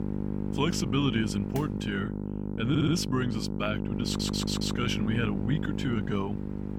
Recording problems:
electrical hum; loud; throughout; 50 Hz, 6 dB below the speech
machinery noise; faint; throughout; 20 dB below the speech
audio stuttering; at 2.5 s and at 4 s

